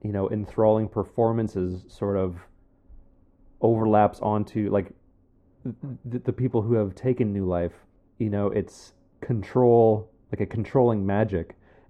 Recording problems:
muffled; very; fading above 1.5 kHz

